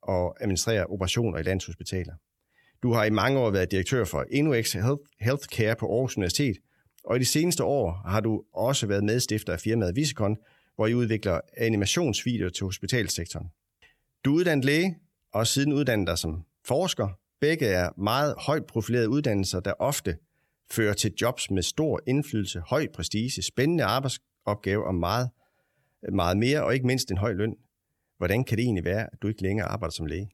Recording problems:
none

